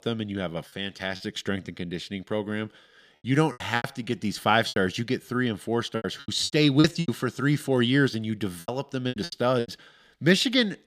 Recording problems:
choppy; very; at 1 s, from 3.5 to 5 s and from 6 to 9.5 s; 13% of the speech affected

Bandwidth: 15 kHz